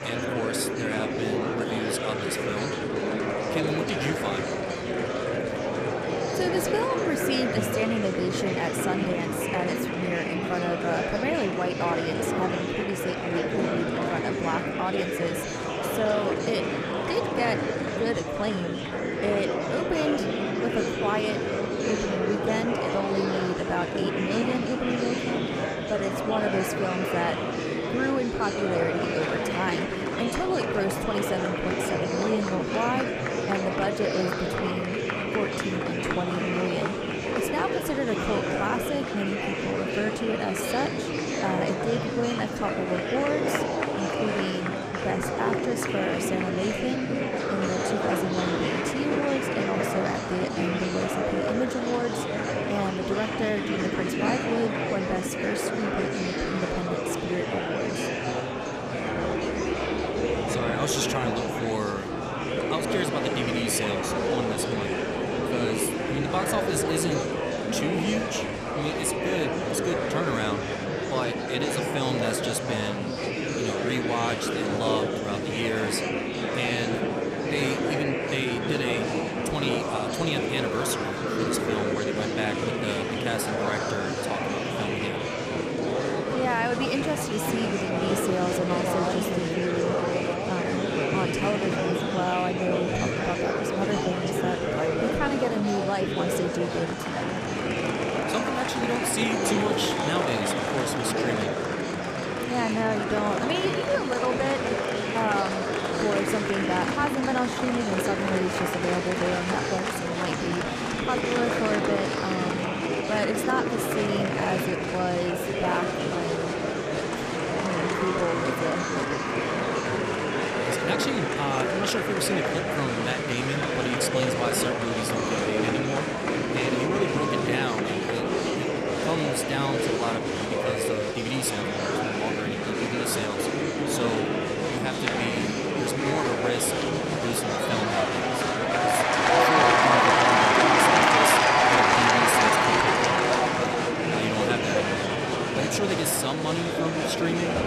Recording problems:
murmuring crowd; very loud; throughout; 4 dB above the speech

